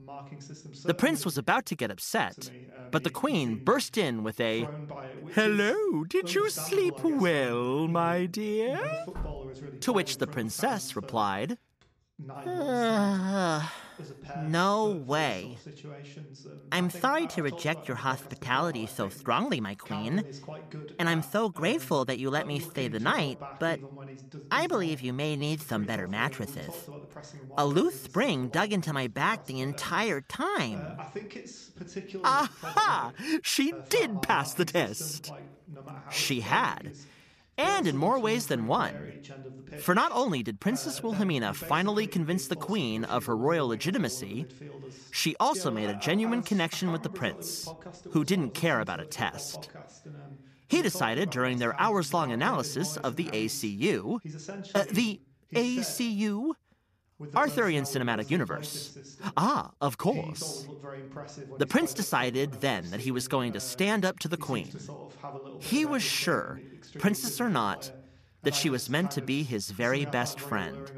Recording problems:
voice in the background; noticeable; throughout; 15 dB below the speech
door banging; faint; at 9 s; peak 10 dB below the speech

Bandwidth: 14.5 kHz